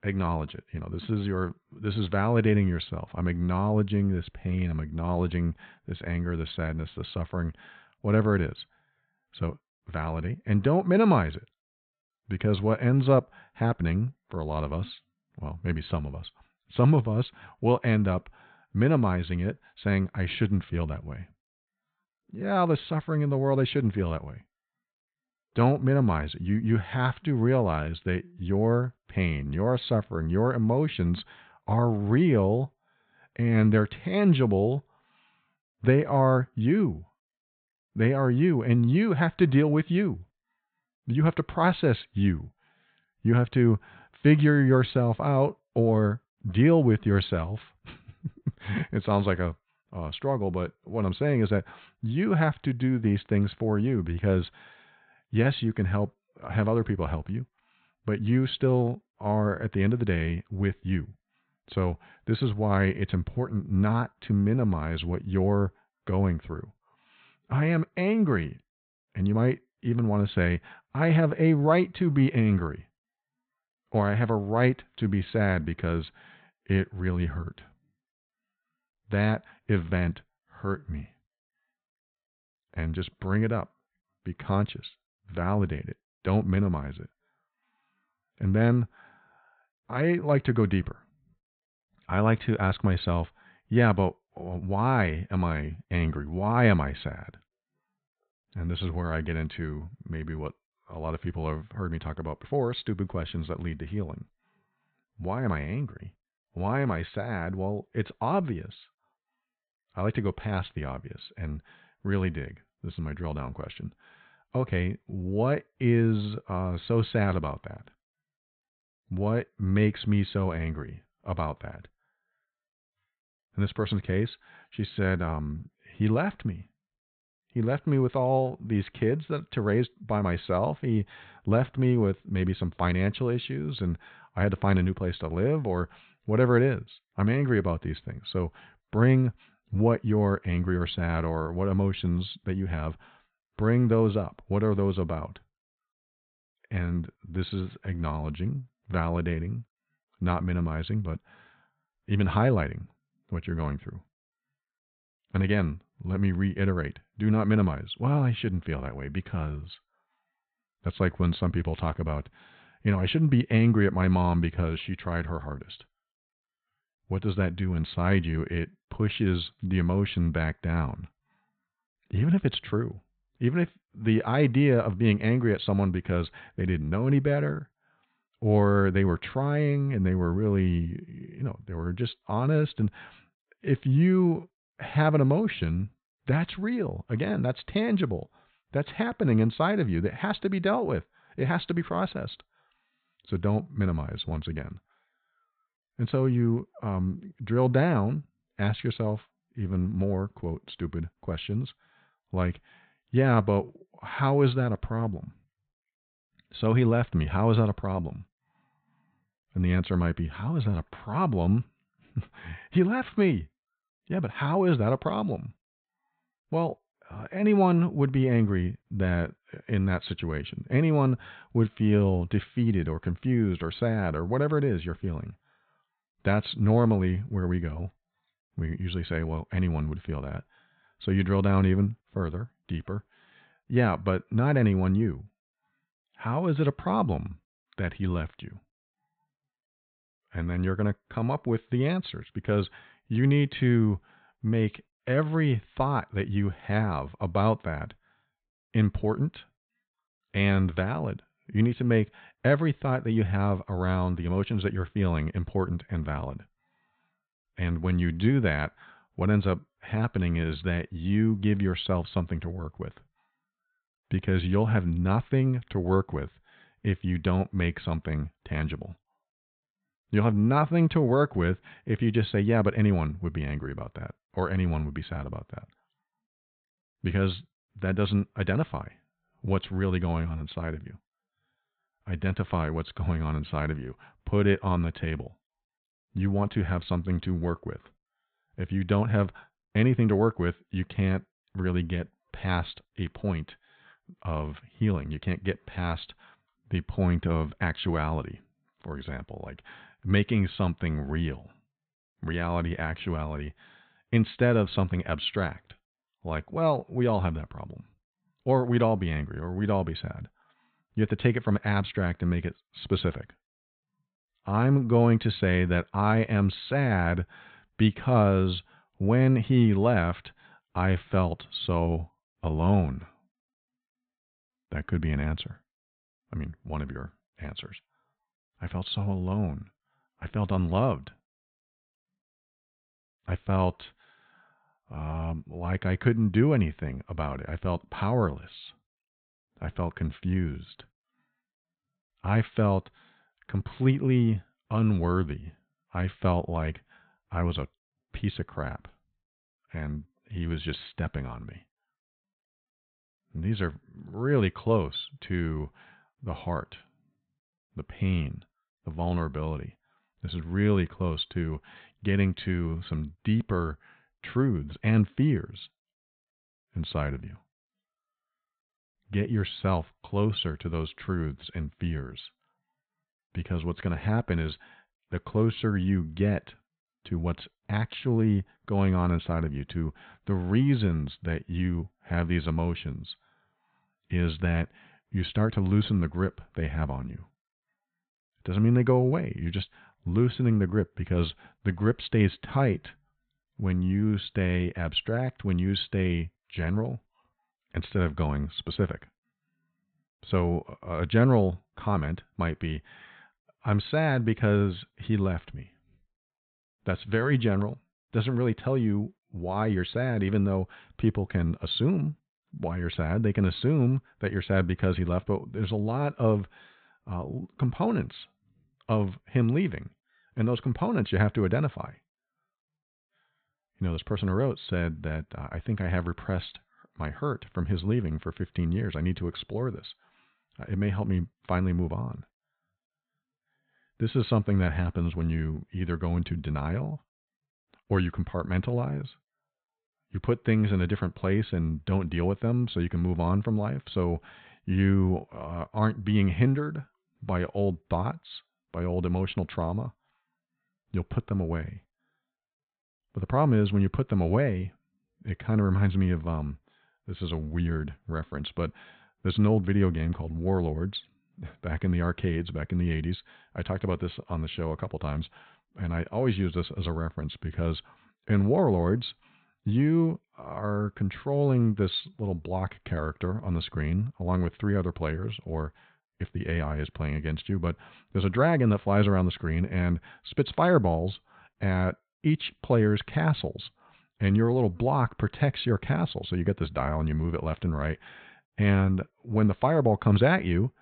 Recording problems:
high frequencies cut off; severe; nothing above 4 kHz

